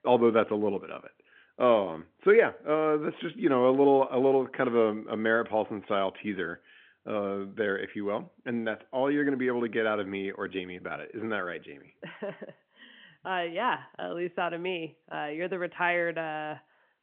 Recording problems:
phone-call audio; nothing above 3.5 kHz

